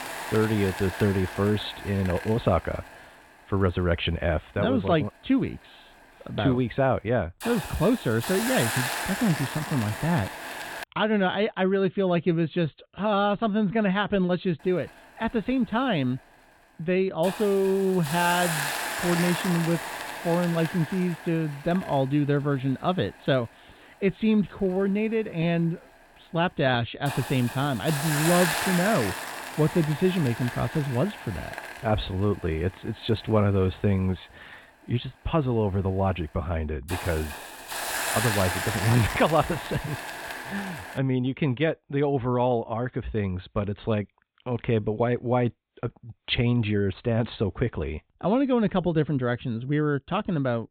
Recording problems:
high frequencies cut off; severe; nothing above 4 kHz
hiss; loud; until 11 s and from 15 to 41 s; 6 dB below the speech

